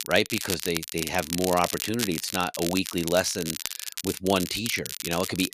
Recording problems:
crackle, like an old record; loud; 5 dB below the speech

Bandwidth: 14.5 kHz